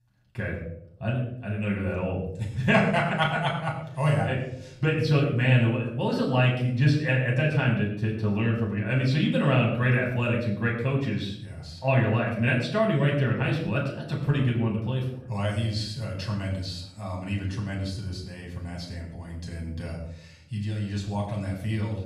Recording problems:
off-mic speech; far
room echo; noticeable; dies away in 0.6 s

